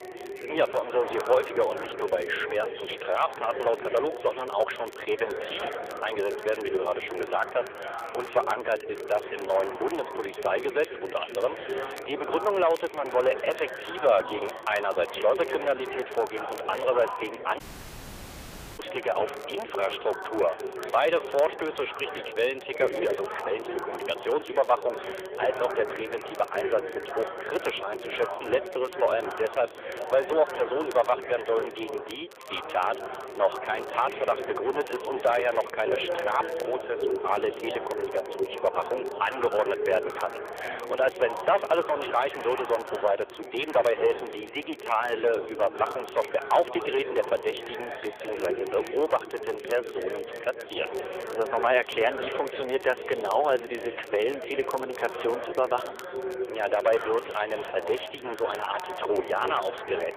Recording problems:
phone-call audio; nothing above 3.5 kHz
distortion; slight; 3% of the sound clipped
chatter from many people; loud; throughout; 7 dB below the speech
crackle, like an old record; faint; 25 dB below the speech
audio cutting out; at 18 s for 1 s

